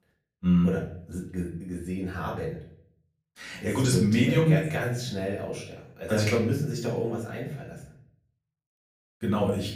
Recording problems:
off-mic speech; far
room echo; slight; dies away in 0.5 s

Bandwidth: 15 kHz